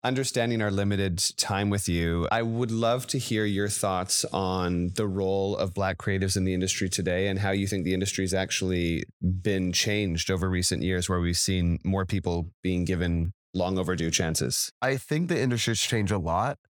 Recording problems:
none

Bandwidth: 18 kHz